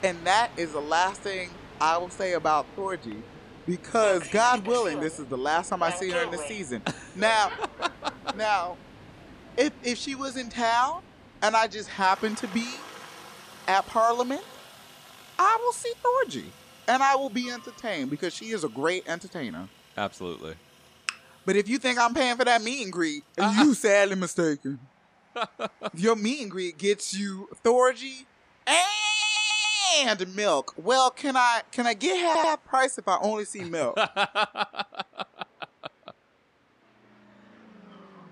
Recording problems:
train or aircraft noise; noticeable; throughout; 20 dB below the speech
audio stuttering; at 29 s and at 32 s

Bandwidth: 15 kHz